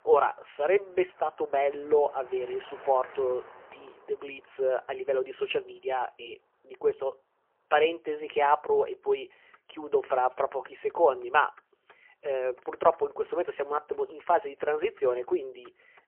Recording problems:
phone-call audio; poor line; nothing above 3 kHz
traffic noise; faint; throughout; 25 dB below the speech

